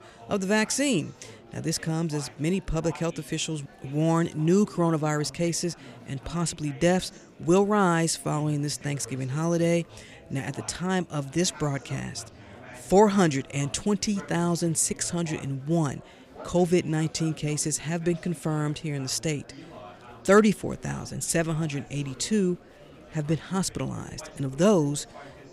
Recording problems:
murmuring crowd; faint; throughout; 20 dB below the speech

